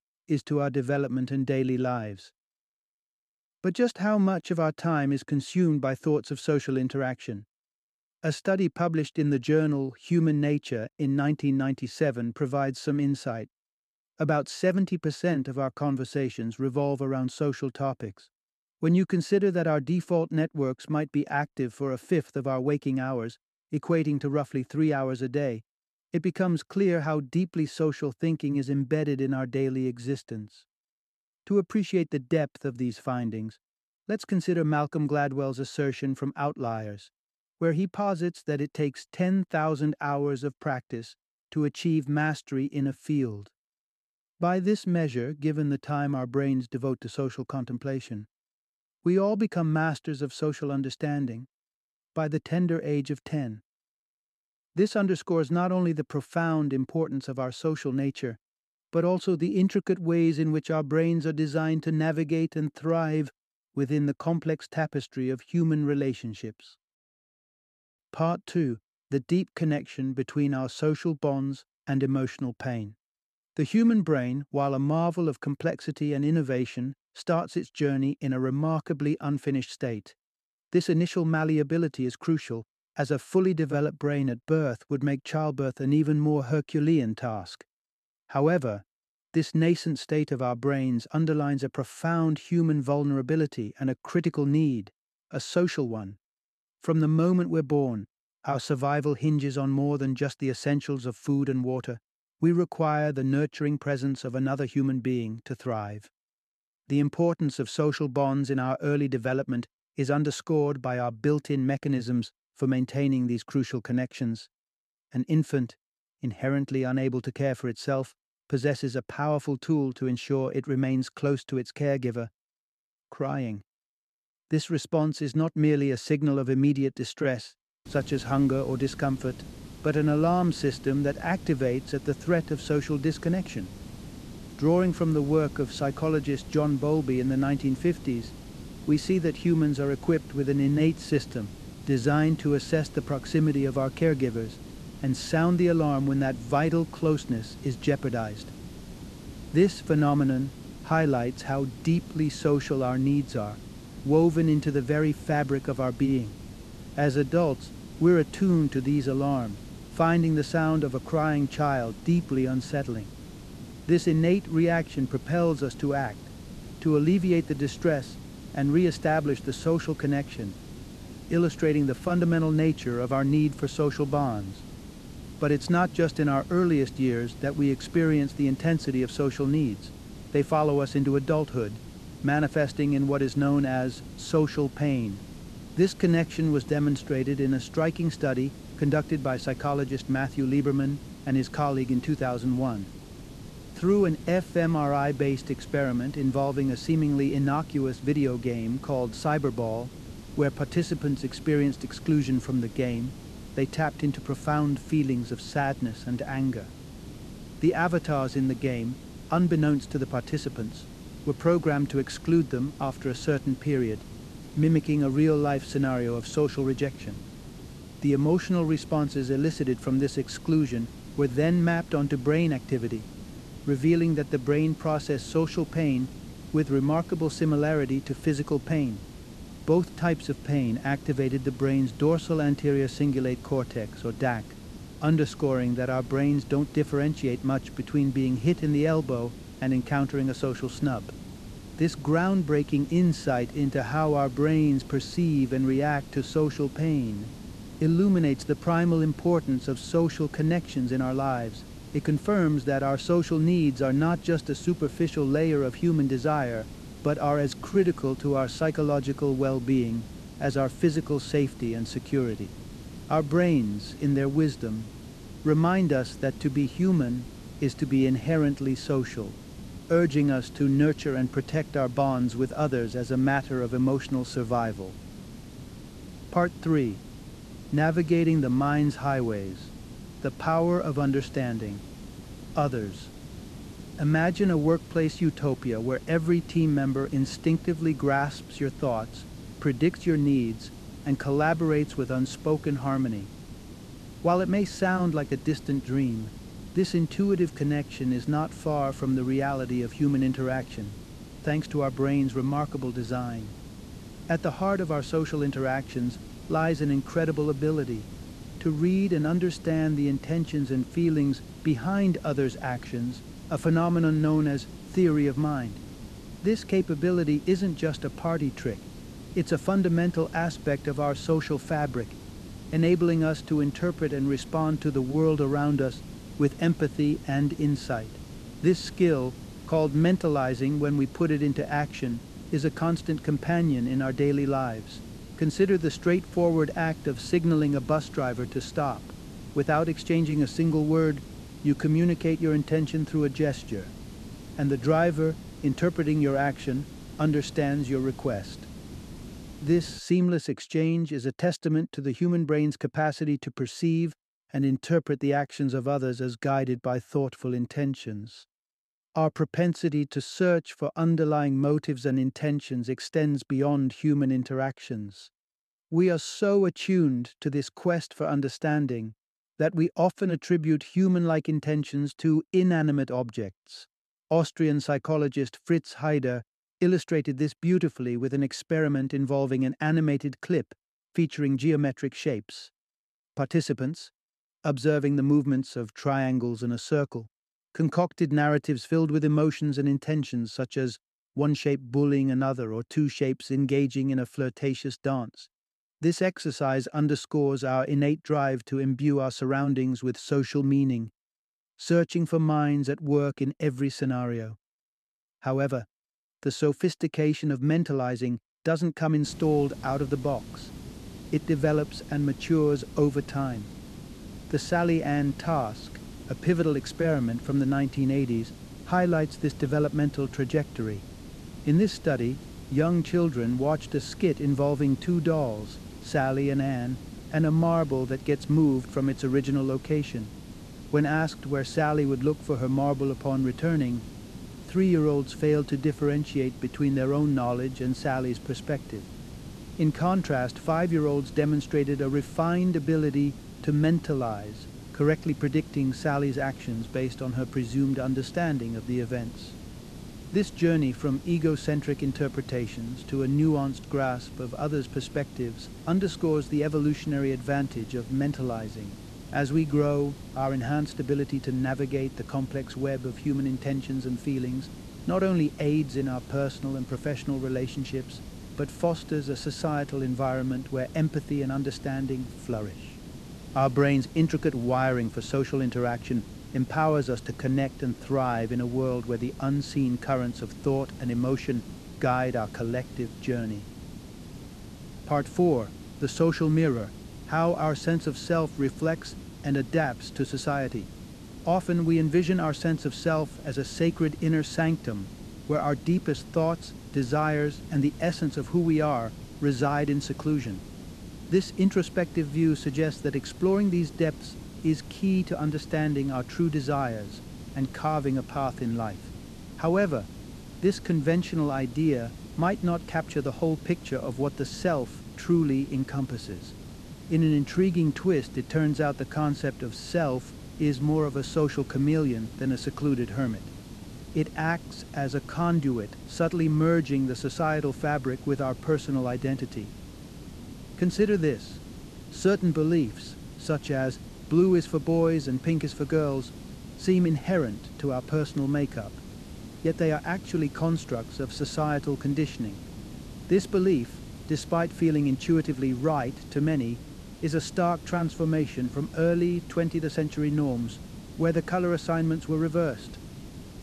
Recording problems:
hiss; noticeable; from 2:08 to 5:50 and from 6:49 on; 15 dB below the speech

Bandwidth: 13.5 kHz